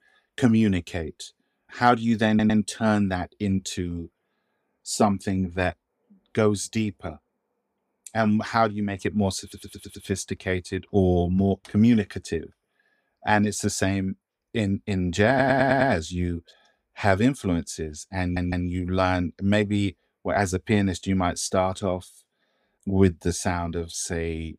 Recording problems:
audio stuttering; 4 times, first at 2.5 s

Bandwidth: 15.5 kHz